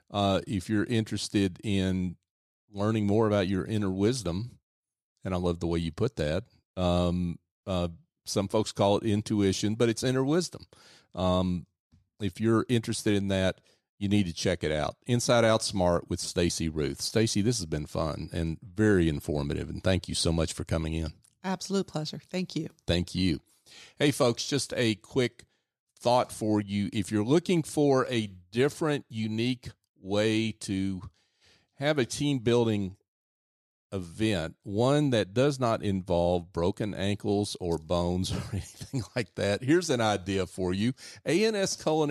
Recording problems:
abrupt cut into speech; at the end

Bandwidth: 14.5 kHz